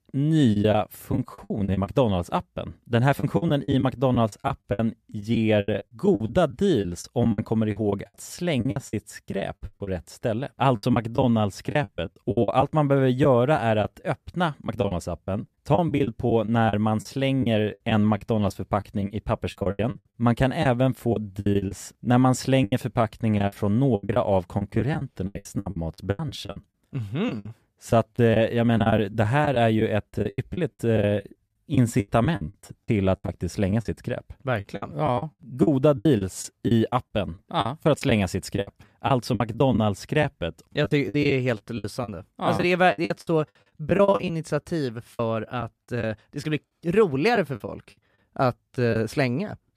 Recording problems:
choppy; very; 14% of the speech affected

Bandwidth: 14.5 kHz